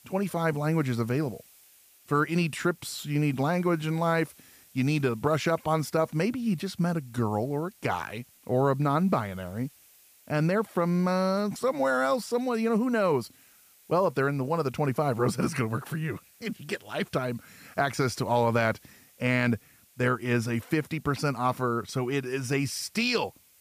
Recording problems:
hiss; faint; throughout; 25 dB below the speech

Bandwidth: 15 kHz